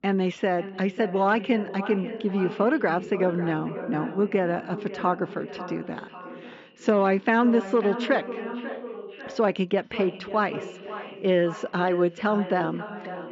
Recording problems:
echo of what is said; strong; throughout; 540 ms later, 10 dB below the speech
high frequencies cut off; noticeable; nothing above 7.5 kHz
muffled; very slightly; fading above 3 kHz

